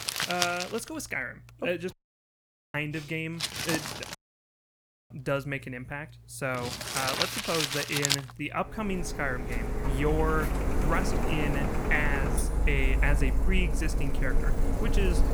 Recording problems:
household noises; very loud; throughout; 2 dB above the speech
audio cutting out; at 2 s for 1 s and at 4 s for 1 s

